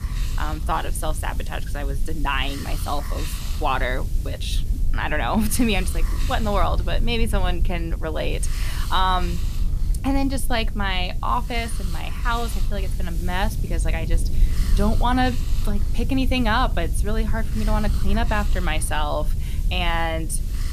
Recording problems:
hiss; noticeable; throughout; 15 dB below the speech
low rumble; noticeable; throughout; 20 dB below the speech

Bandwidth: 14.5 kHz